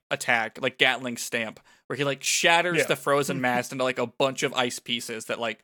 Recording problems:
none

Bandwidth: 18 kHz